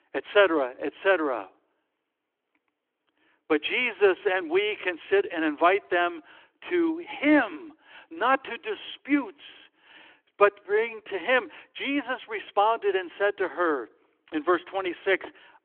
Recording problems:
phone-call audio; nothing above 3.5 kHz

